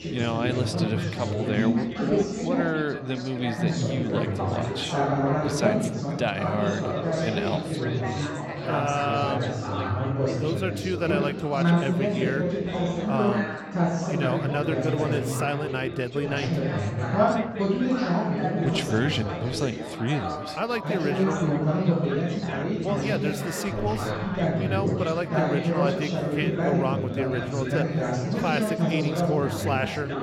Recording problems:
chatter from many people; very loud; throughout; 3 dB above the speech

